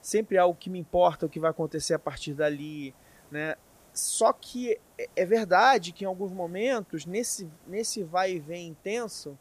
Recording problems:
hiss; faint; throughout; 30 dB below the speech

